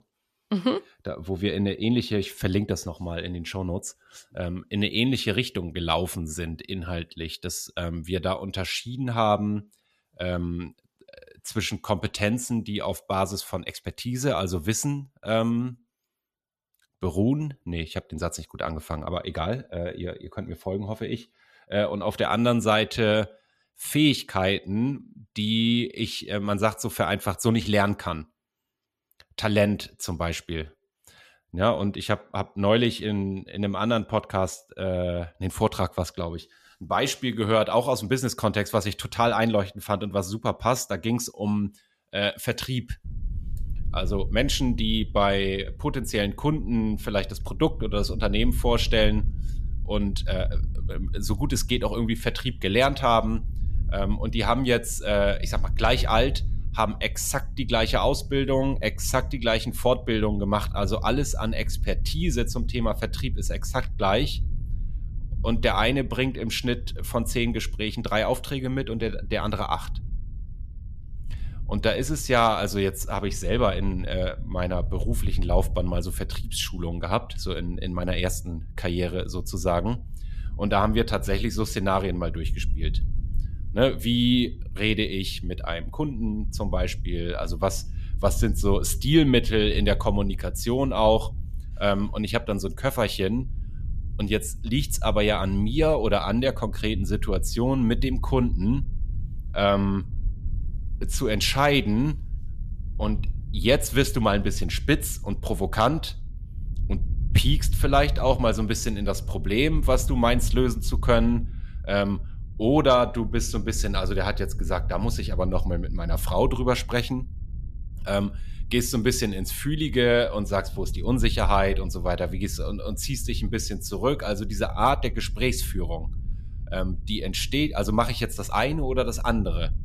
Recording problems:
low rumble; faint; from 43 s on; 25 dB below the speech

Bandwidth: 14.5 kHz